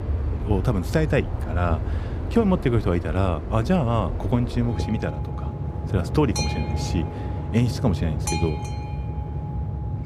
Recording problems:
train or aircraft noise; loud; throughout; 4 dB below the speech

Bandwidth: 15 kHz